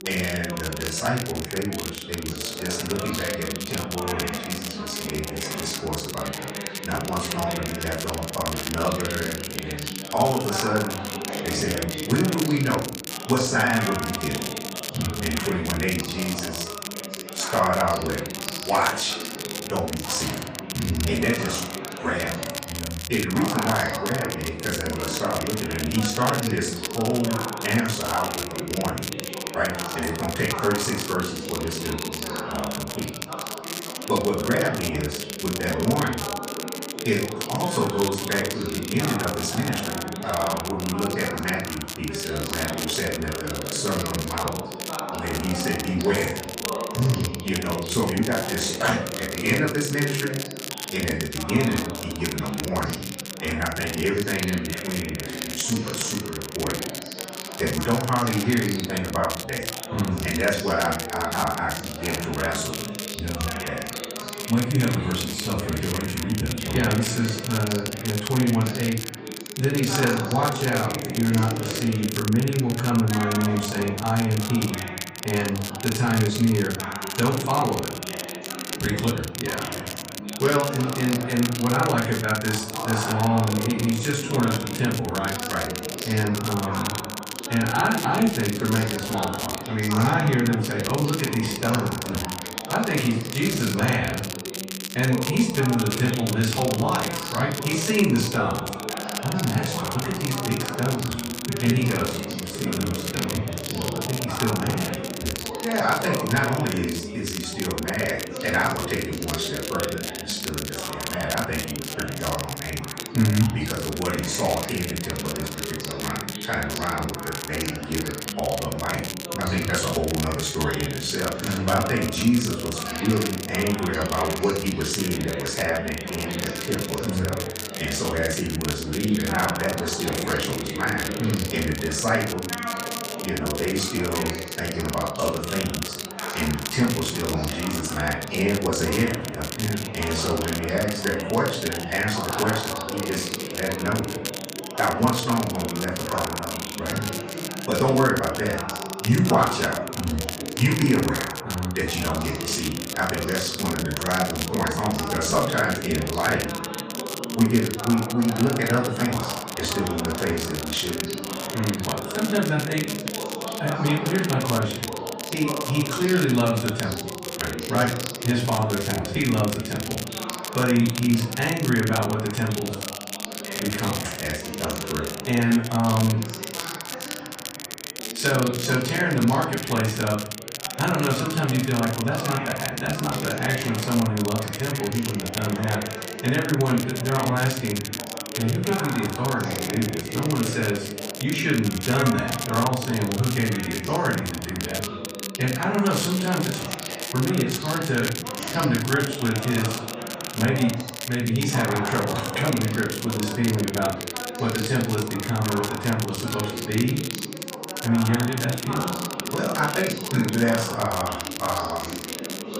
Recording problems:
off-mic speech; far
room echo; noticeable; dies away in 0.5 s
background chatter; loud; throughout; 3 voices, 8 dB below the speech
crackle, like an old record; loud; 7 dB below the speech

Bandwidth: 15 kHz